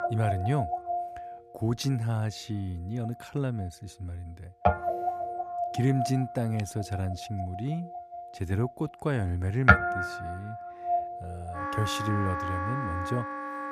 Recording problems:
background music; very loud; throughout; 1 dB above the speech

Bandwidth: 14.5 kHz